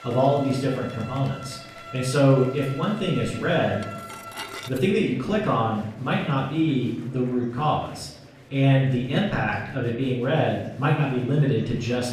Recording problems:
off-mic speech; far
room echo; noticeable; dies away in 0.7 s
background music; noticeable; throughout; 15 dB below the speech
murmuring crowd; faint; throughout; 25 dB below the speech
clattering dishes; faint; at 4 s; peak 10 dB below the speech

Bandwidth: 14.5 kHz